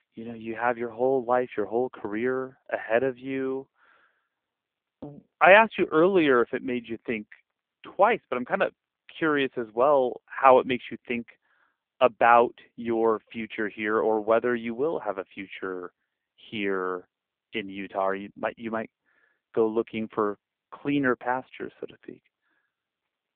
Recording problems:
phone-call audio; poor line; nothing above 3.5 kHz

